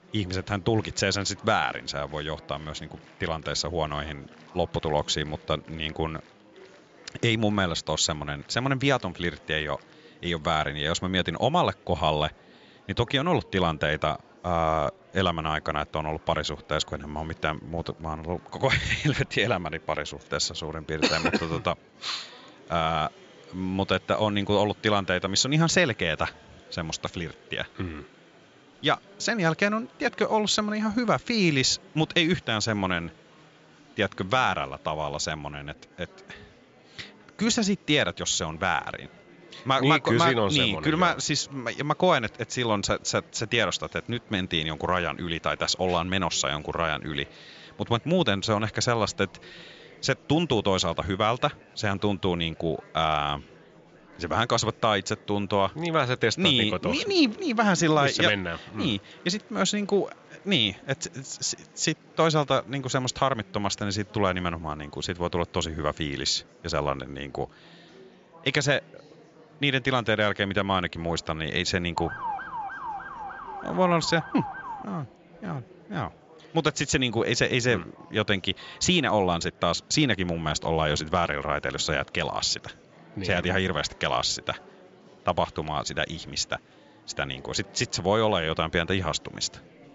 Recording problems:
high frequencies cut off; noticeable; nothing above 7.5 kHz
murmuring crowd; faint; throughout; 25 dB below the speech
siren; noticeable; from 1:12 to 1:15; peak 6 dB below the speech

